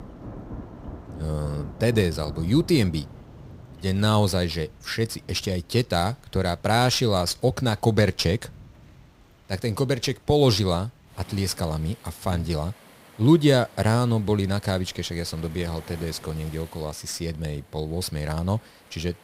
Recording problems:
rain or running water; faint; throughout; 20 dB below the speech

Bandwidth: 15.5 kHz